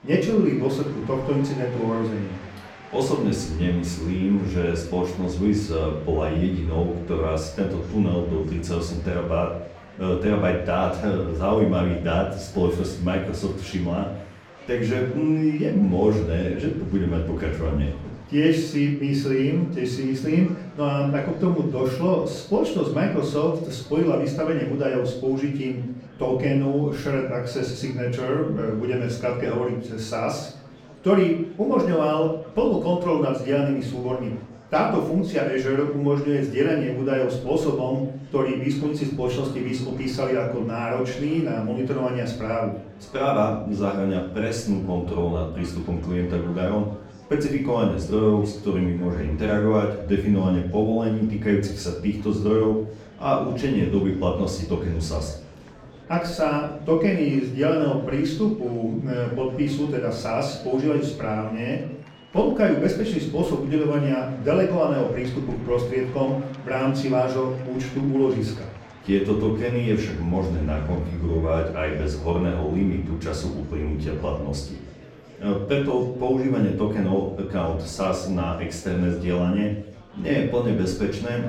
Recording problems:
off-mic speech; far
room echo; slight; dies away in 0.5 s
murmuring crowd; faint; throughout; 20 dB below the speech

